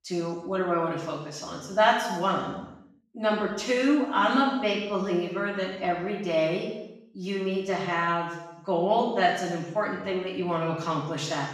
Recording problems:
off-mic speech; far
room echo; noticeable; dies away in 0.9 s

